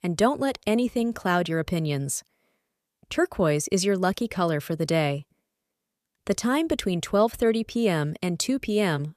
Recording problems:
none

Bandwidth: 14.5 kHz